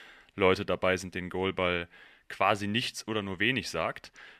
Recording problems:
thin; somewhat; fading below 400 Hz

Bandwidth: 13.5 kHz